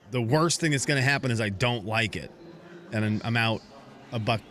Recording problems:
murmuring crowd; faint; throughout; 25 dB below the speech

